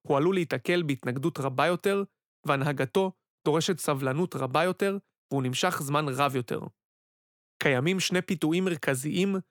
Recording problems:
none

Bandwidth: 18.5 kHz